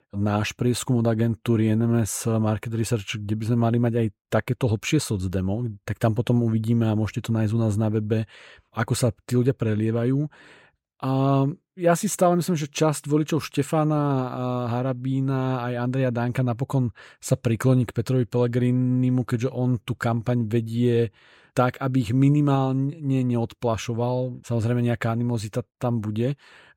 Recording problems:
none

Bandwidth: 16 kHz